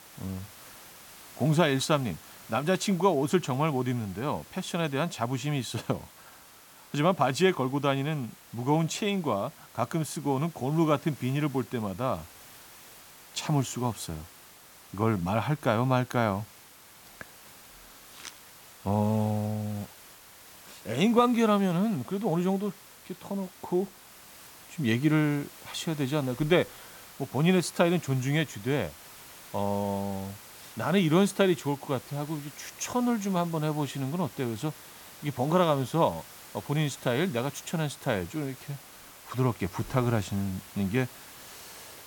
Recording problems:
hiss; noticeable; throughout; 20 dB below the speech

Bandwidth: 17.5 kHz